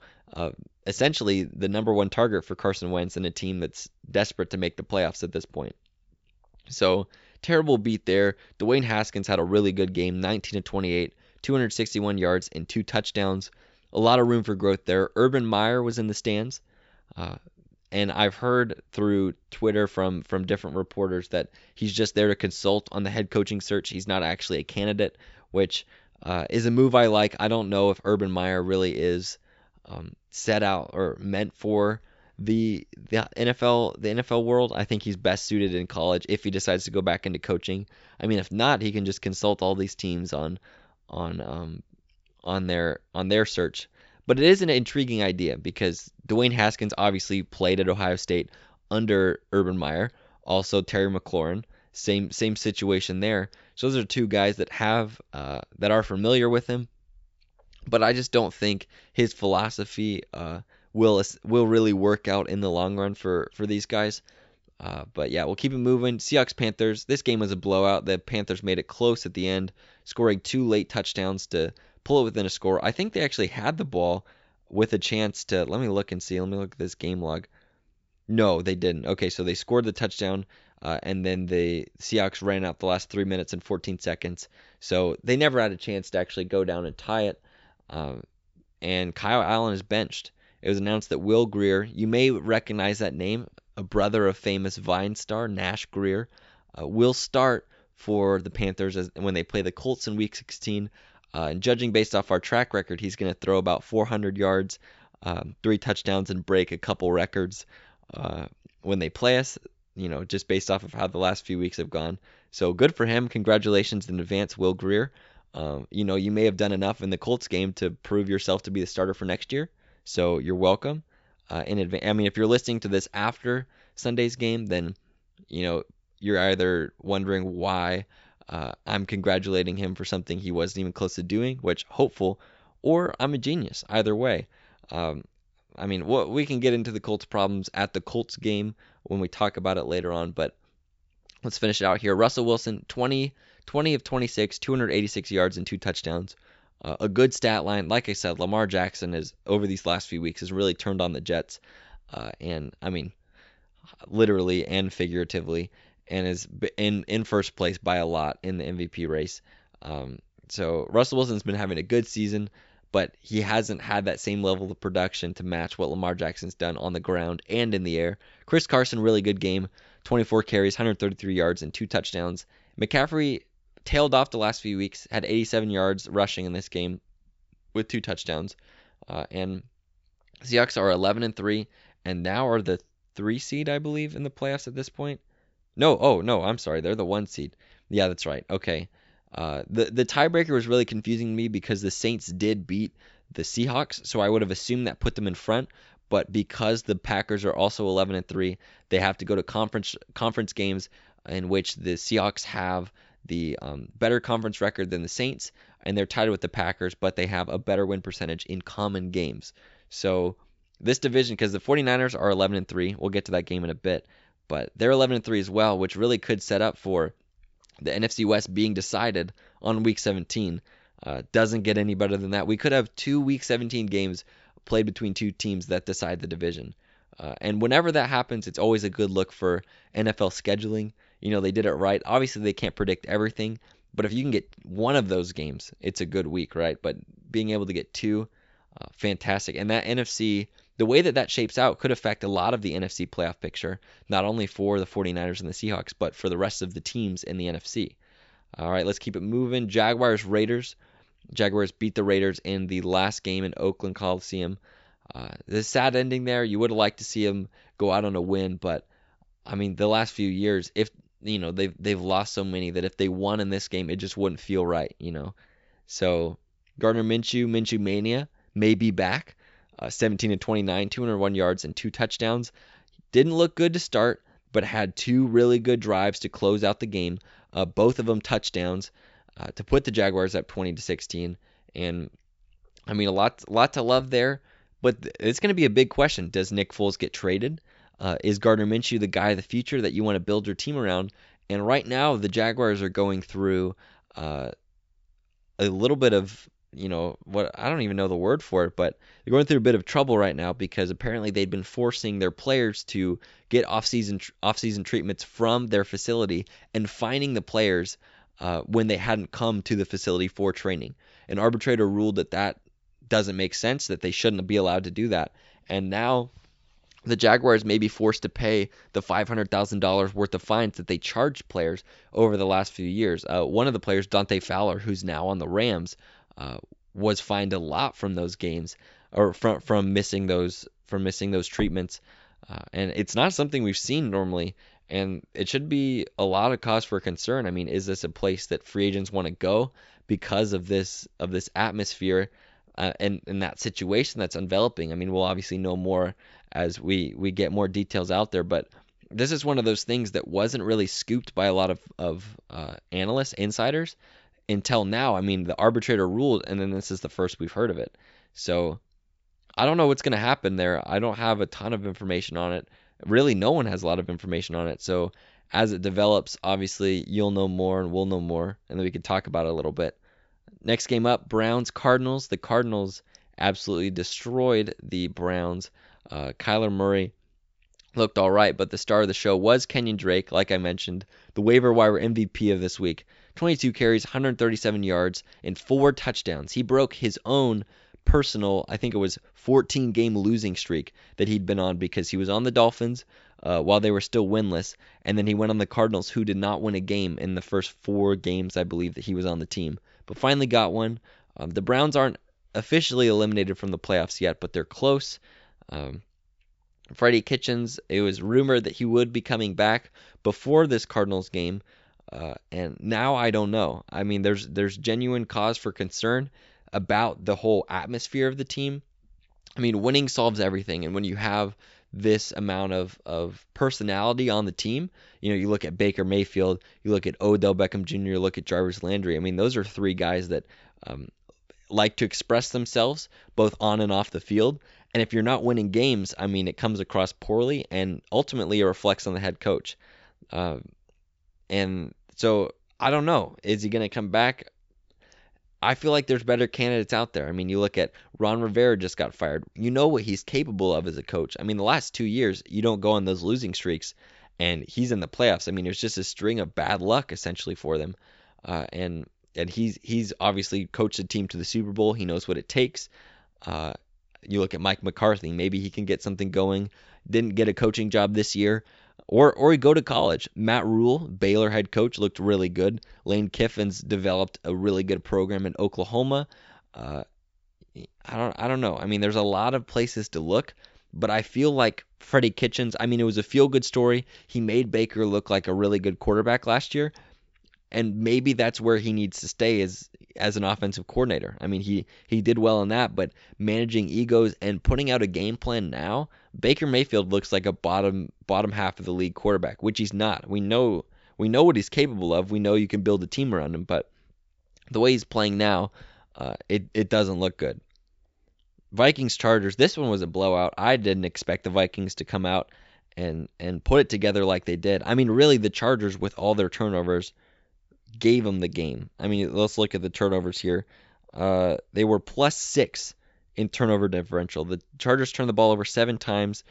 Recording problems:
high frequencies cut off; noticeable; nothing above 8 kHz

